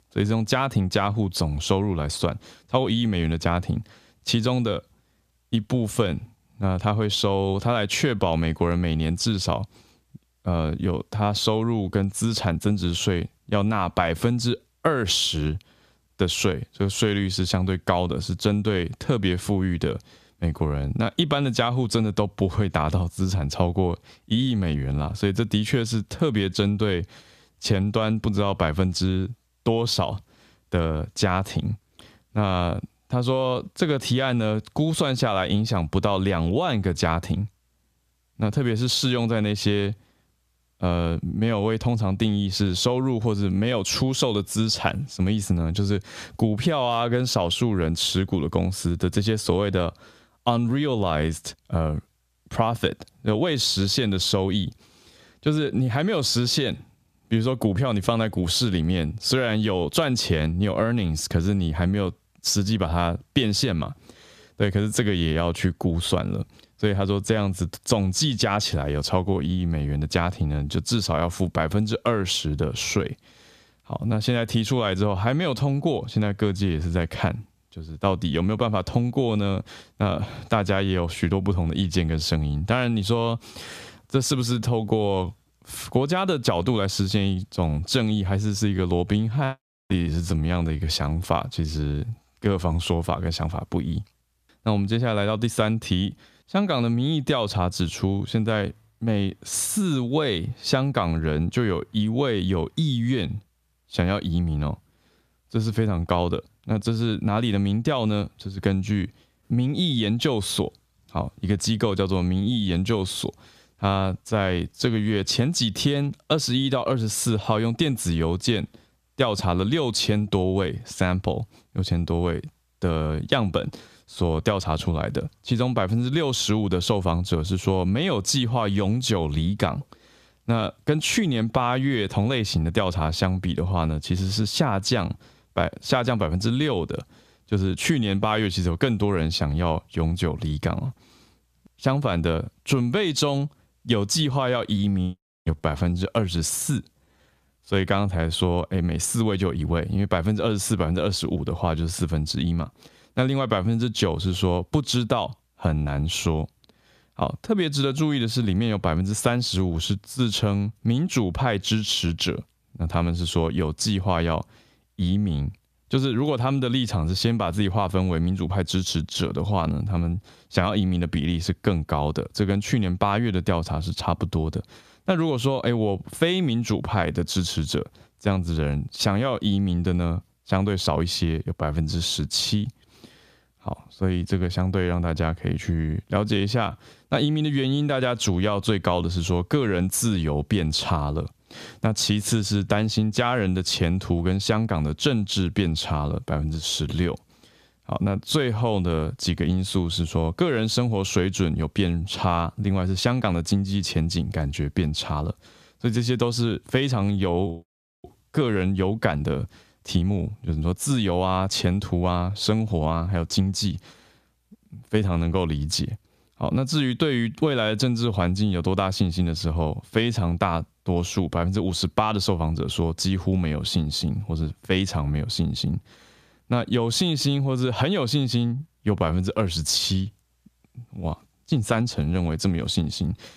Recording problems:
squashed, flat; somewhat

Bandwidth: 14.5 kHz